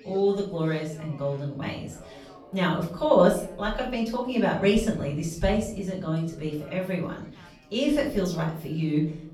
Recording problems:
off-mic speech; far
room echo; slight; dies away in 0.6 s
background chatter; faint; throughout; 4 voices, 25 dB below the speech

